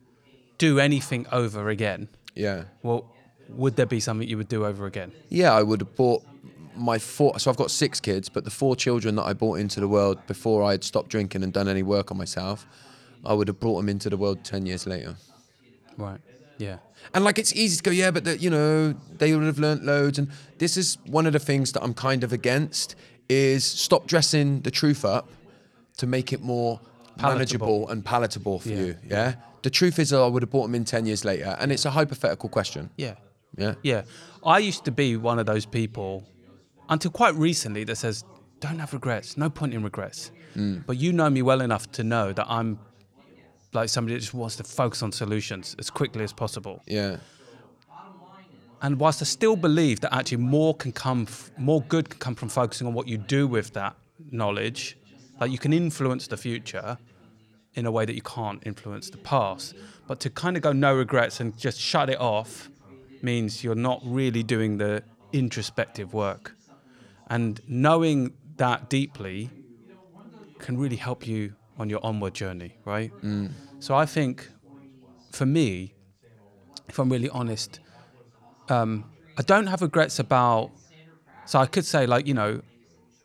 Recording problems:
background chatter; faint; throughout; 3 voices, 30 dB below the speech

